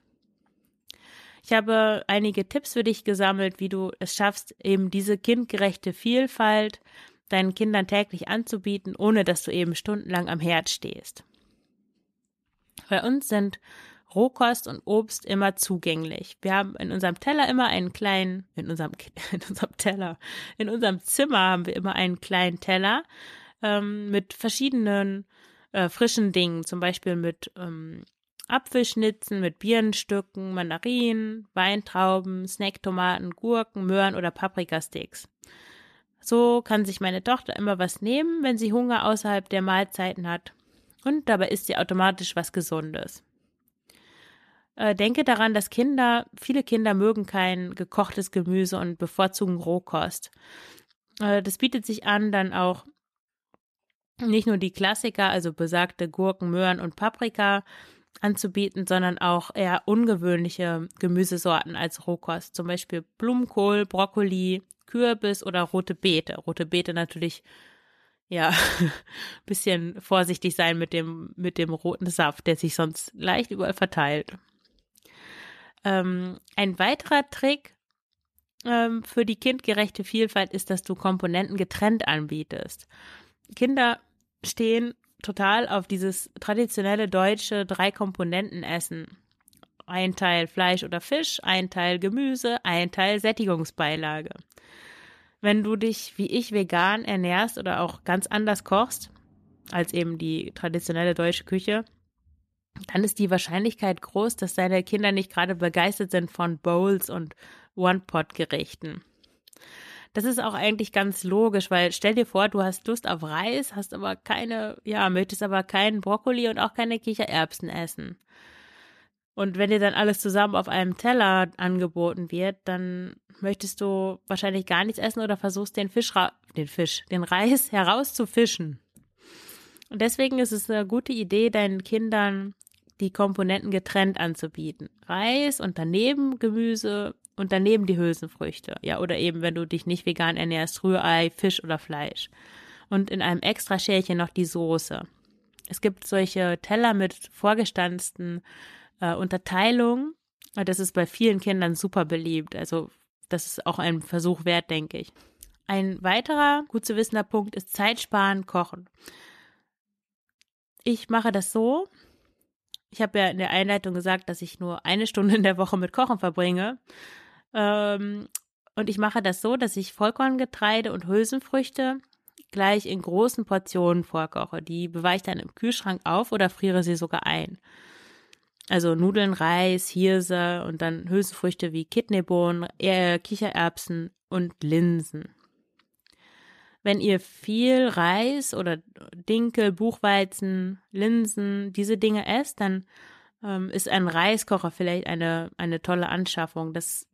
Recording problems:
none

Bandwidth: 14 kHz